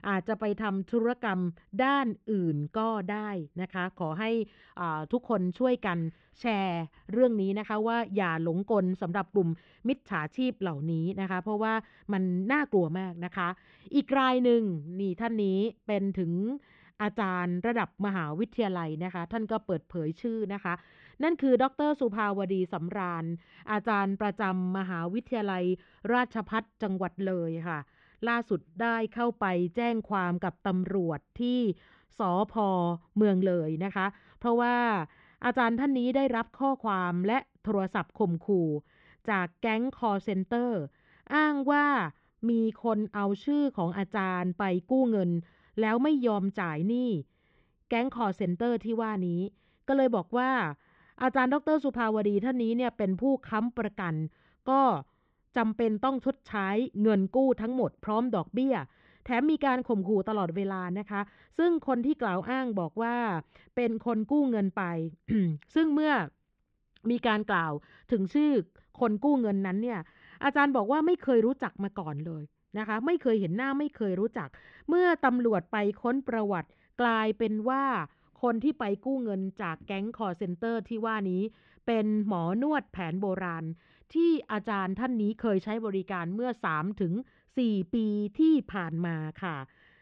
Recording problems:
muffled; very; fading above 3 kHz

